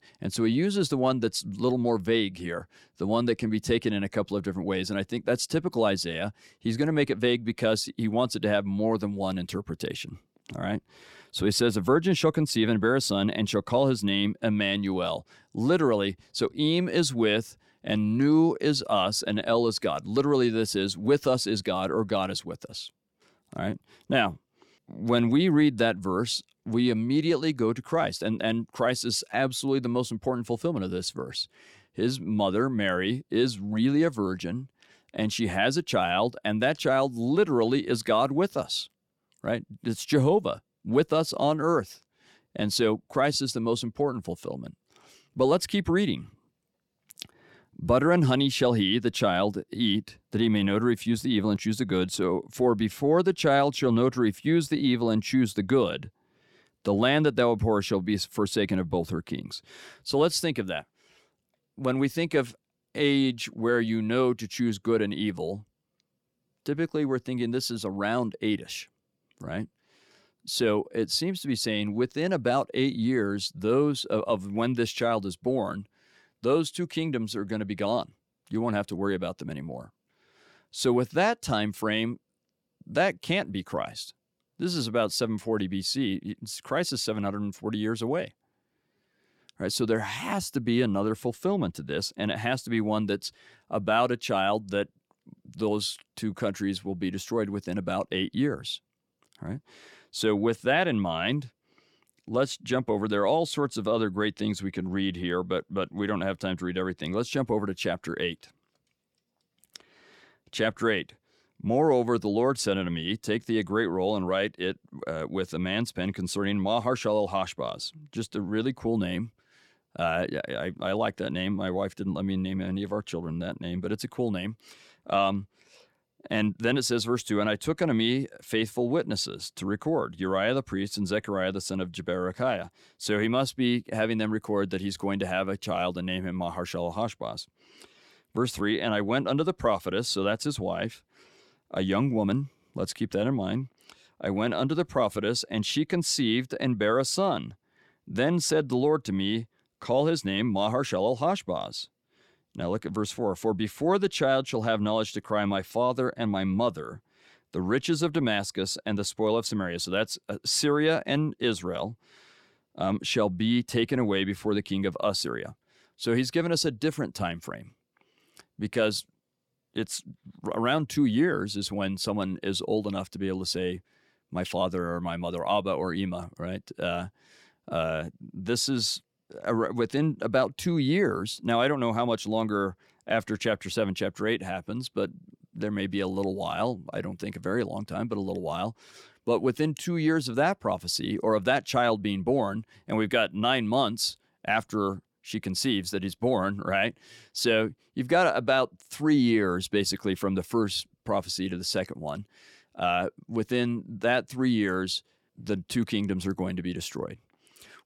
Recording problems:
none

